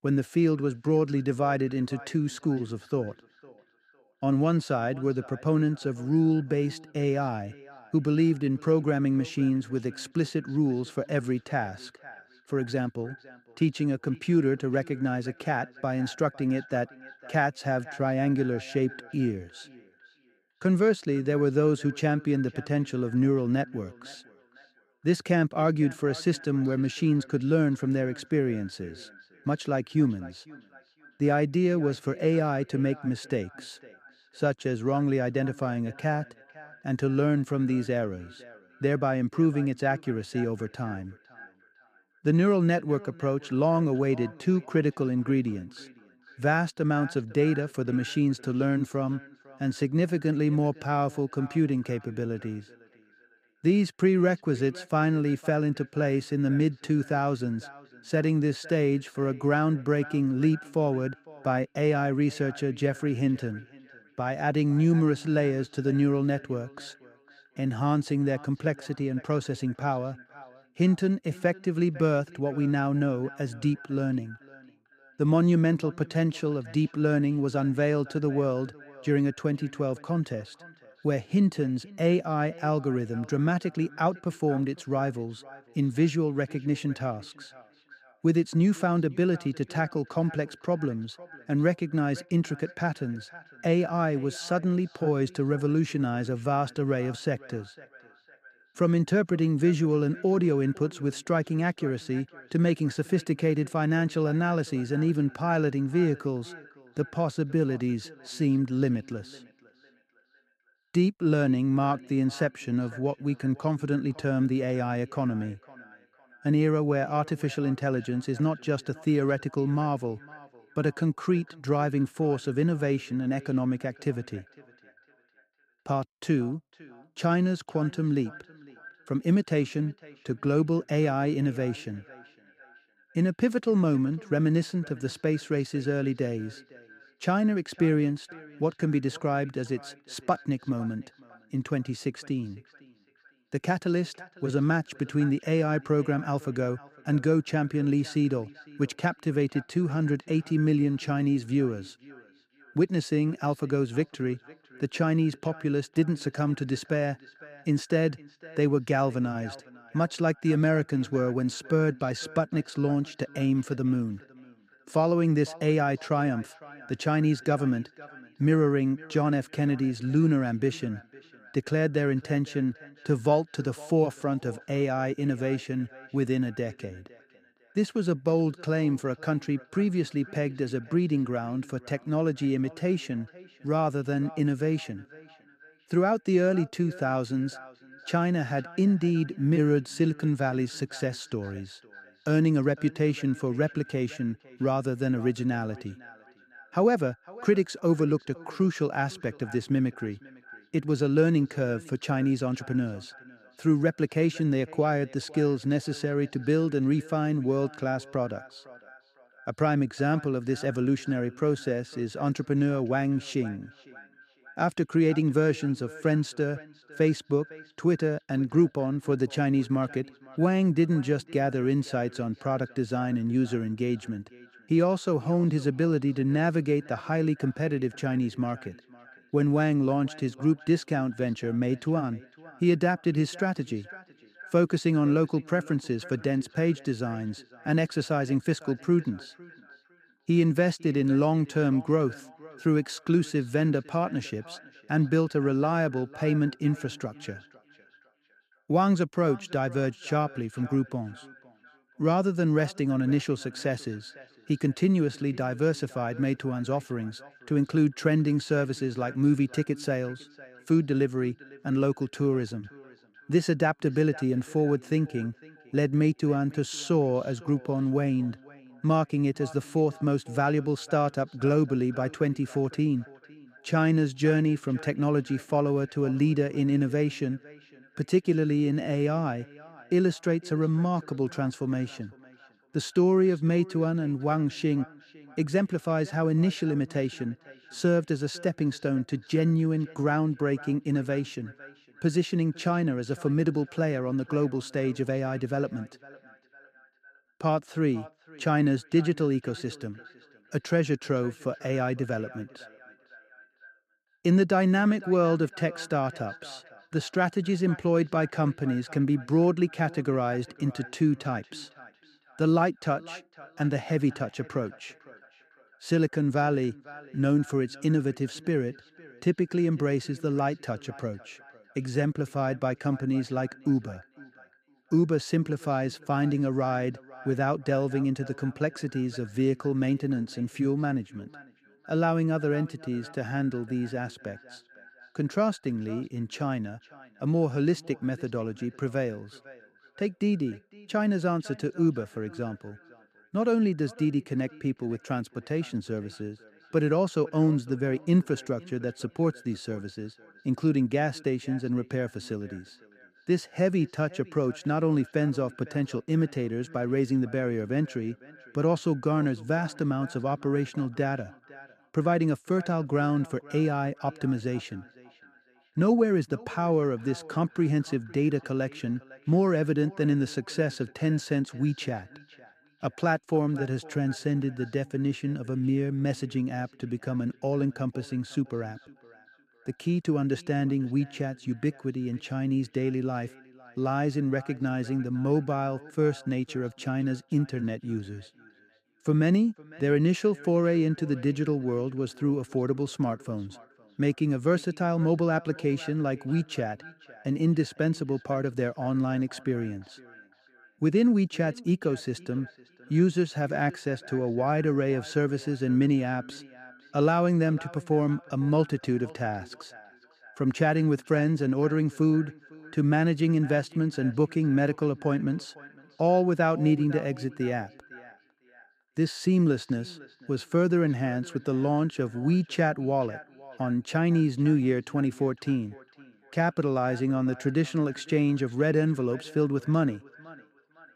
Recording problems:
echo of what is said; faint; throughout; 510 ms later, 20 dB below the speech

